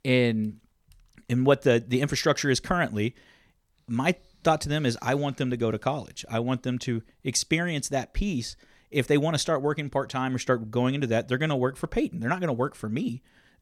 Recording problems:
none

